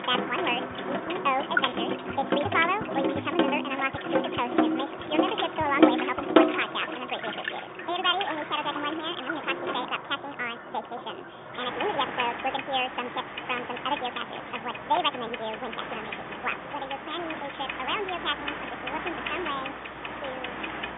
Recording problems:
wrong speed and pitch; too fast and too high; 1.6 times normal speed
phone-call audio; nothing above 3.5 kHz
household noises; loud; throughout; as loud as the speech
animal sounds; noticeable; throughout; 10 dB below the speech

